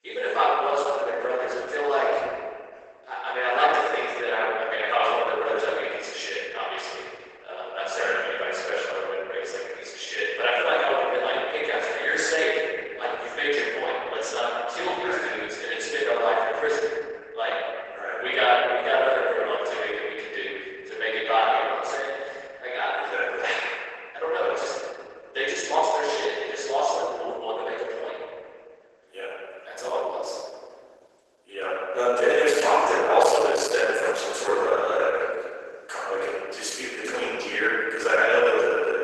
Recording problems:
room echo; strong; dies away in 1.8 s
off-mic speech; far
garbled, watery; badly; nothing above 12 kHz
thin; very; fading below 400 Hz

